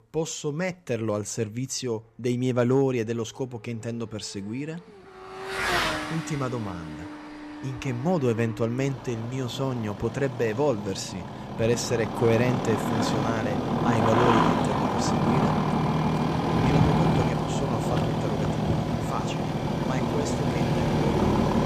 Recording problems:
traffic noise; very loud; throughout; 3 dB above the speech

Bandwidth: 14.5 kHz